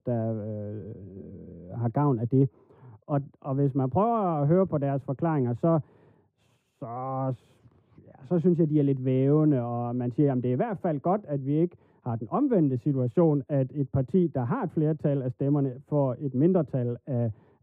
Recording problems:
muffled; very; fading above 1.5 kHz

